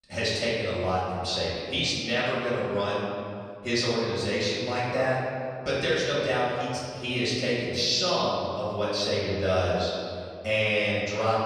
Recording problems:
room echo; strong; dies away in 2.2 s
off-mic speech; far

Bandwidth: 15 kHz